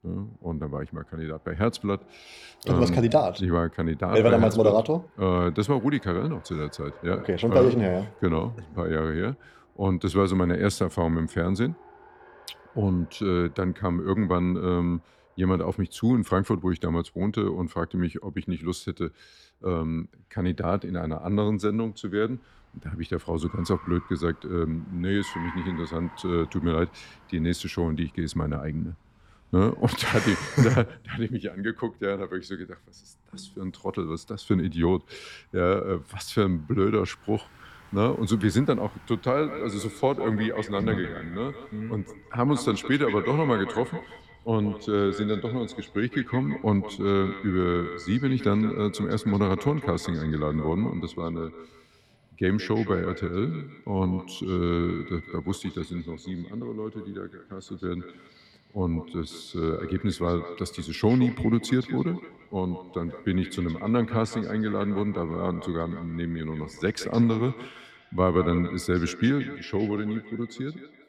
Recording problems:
echo of what is said; noticeable; from 39 s on; 170 ms later, 15 dB below the speech
traffic noise; faint; throughout; 25 dB below the speech

